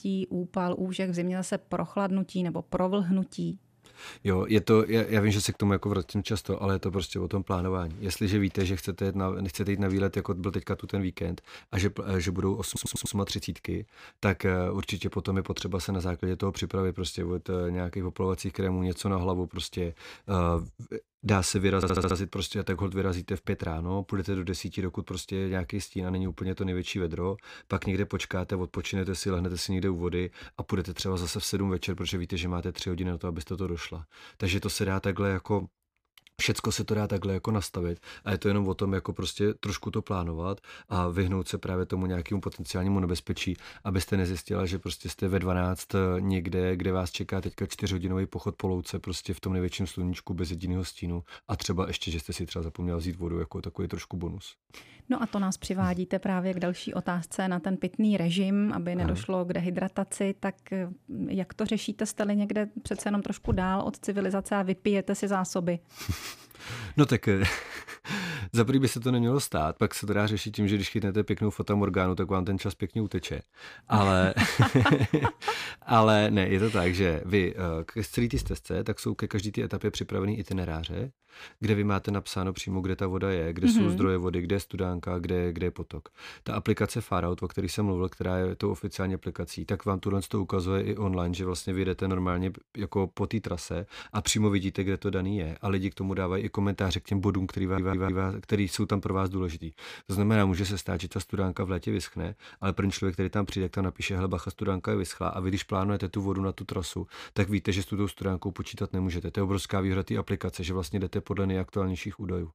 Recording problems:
audio stuttering; at 13 s, at 22 s and at 1:38

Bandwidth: 15 kHz